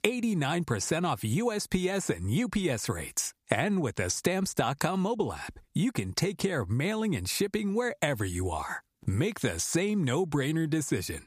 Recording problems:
squashed, flat; somewhat

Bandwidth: 15 kHz